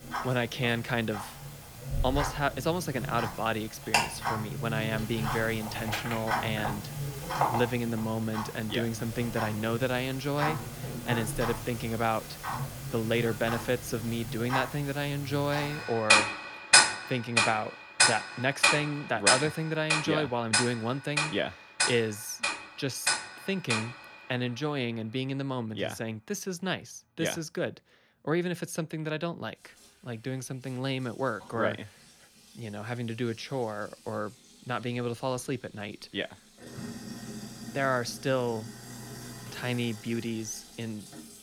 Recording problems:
household noises; very loud; throughout; 2 dB above the speech

